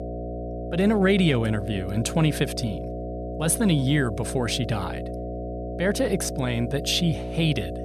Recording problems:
electrical hum; loud; throughout; 60 Hz, 8 dB below the speech

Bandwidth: 13.5 kHz